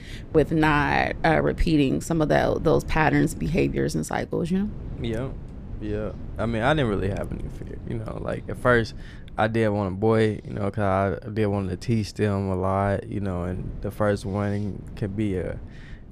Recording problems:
wind noise on the microphone; occasional gusts; 25 dB below the speech

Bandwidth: 14.5 kHz